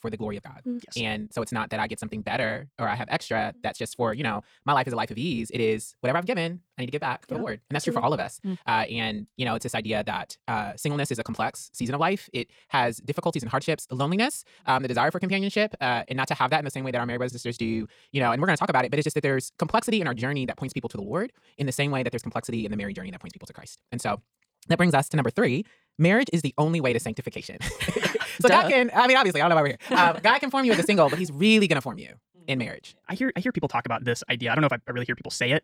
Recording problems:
wrong speed, natural pitch; too fast; 1.7 times normal speed

